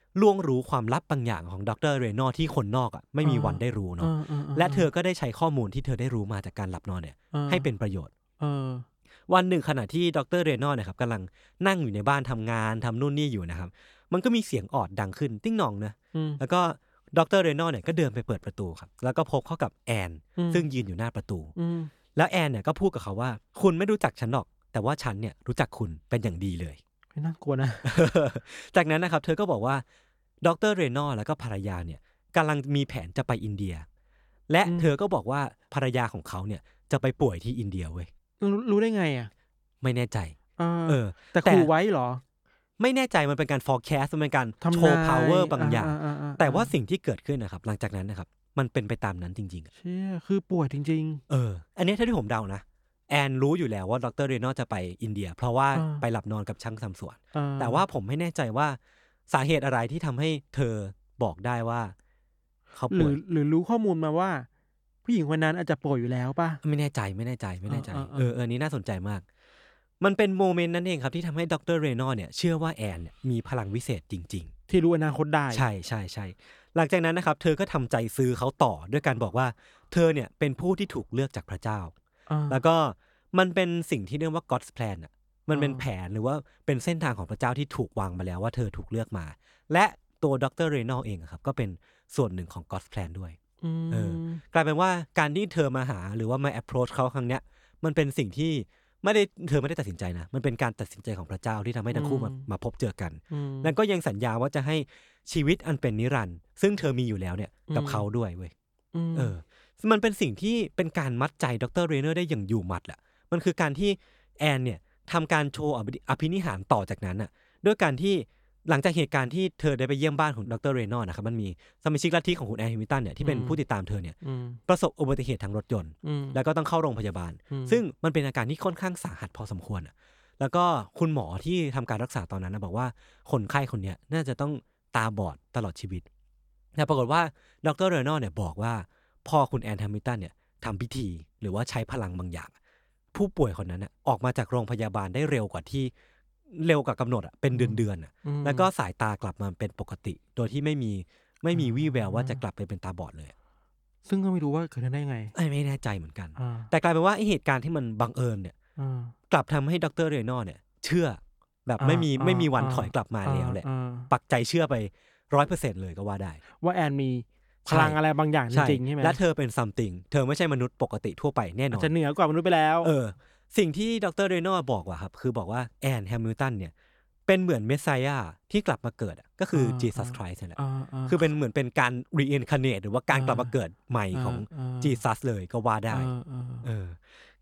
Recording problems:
none

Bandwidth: 18 kHz